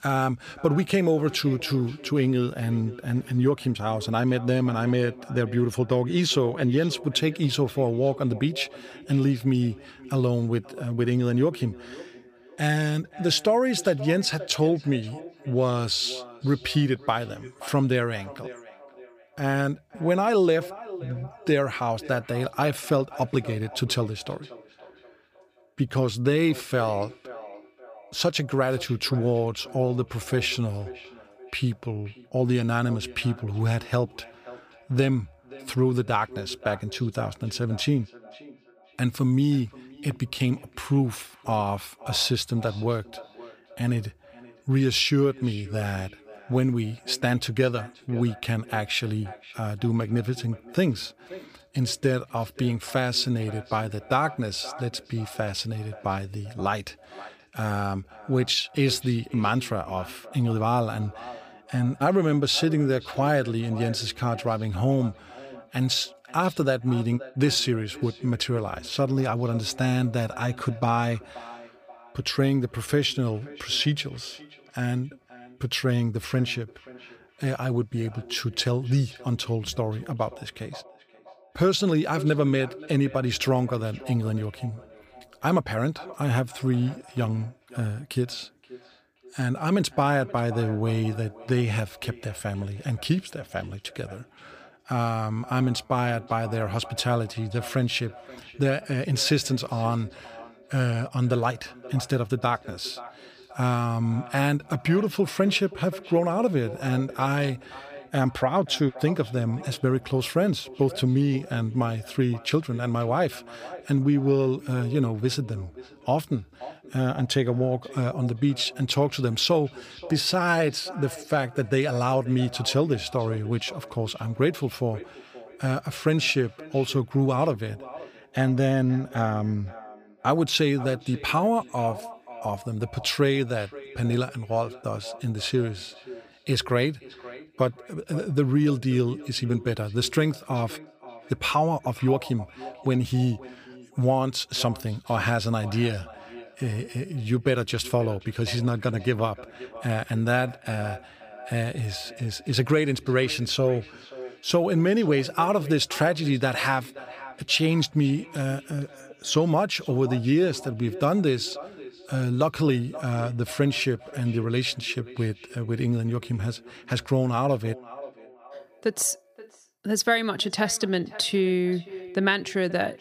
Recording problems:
echo of what is said; faint; throughout; 530 ms later, 20 dB below the speech

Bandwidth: 15 kHz